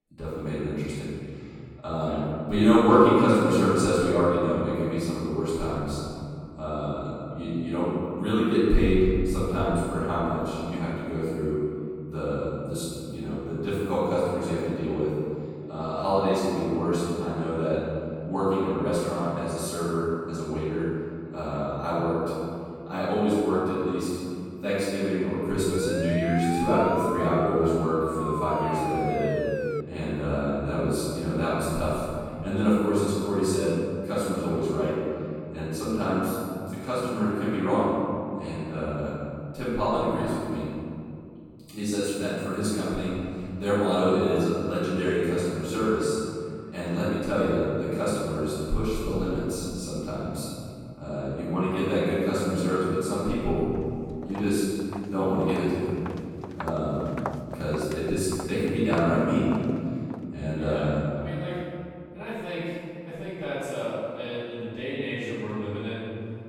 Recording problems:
room echo; strong; dies away in 2.5 s
off-mic speech; far
siren; noticeable; from 26 to 30 s; peak 3 dB below the speech
footsteps; noticeable; from 54 s to 1:00; peak 9 dB below the speech

